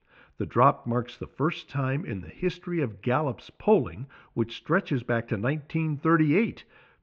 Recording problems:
muffled; very; fading above 3.5 kHz

